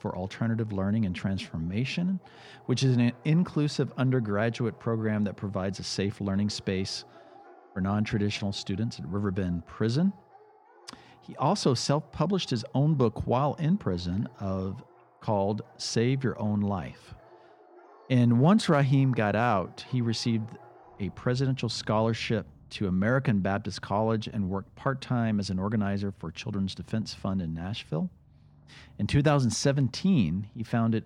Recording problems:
animal sounds; faint; throughout; 25 dB below the speech

